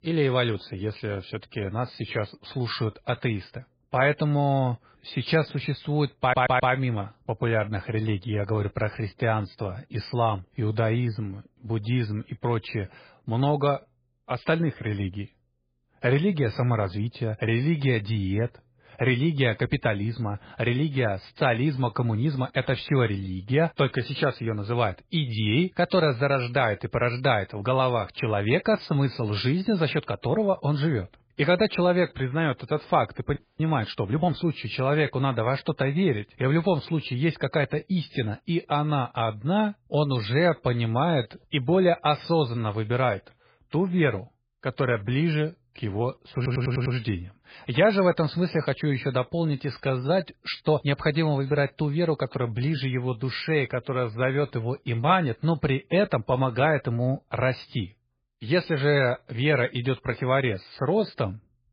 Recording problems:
garbled, watery; badly; nothing above 4.5 kHz
audio stuttering; at 6 s and at 46 s
audio freezing; at 33 s

